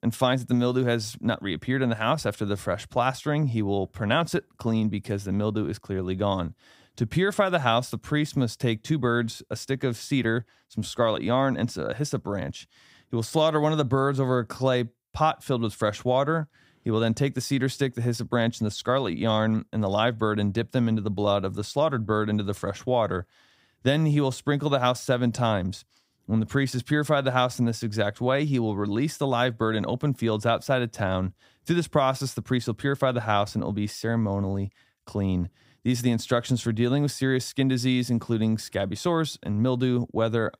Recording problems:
none

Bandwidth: 15.5 kHz